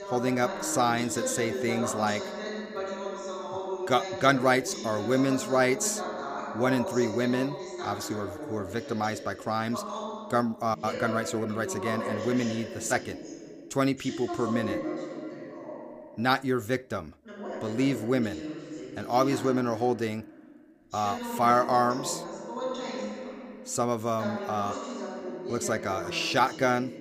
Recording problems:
voice in the background; loud; throughout; 8 dB below the speech

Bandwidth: 15 kHz